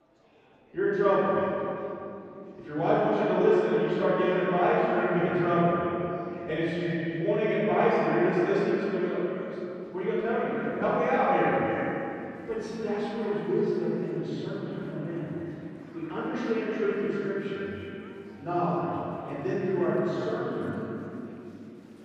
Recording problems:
echo of what is said; strong; throughout; 310 ms later, 9 dB below the speech
room echo; strong; dies away in 2.9 s
off-mic speech; far
murmuring crowd; faint; throughout; 25 dB below the speech

